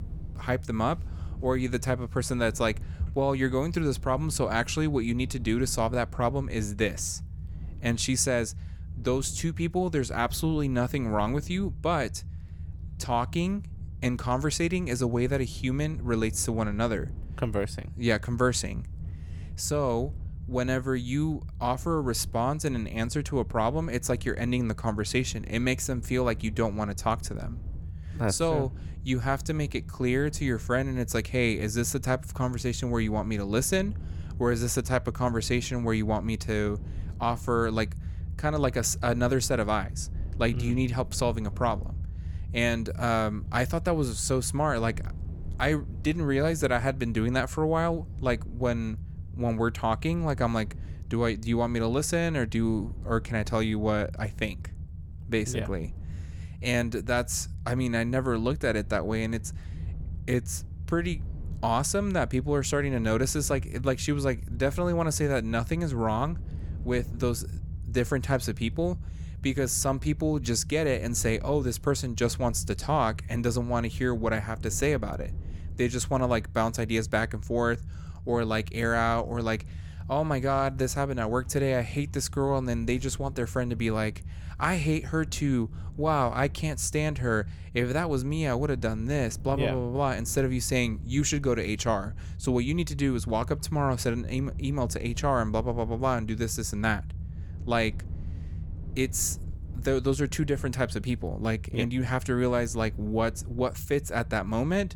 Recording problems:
low rumble; faint; throughout; 25 dB below the speech

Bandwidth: 17.5 kHz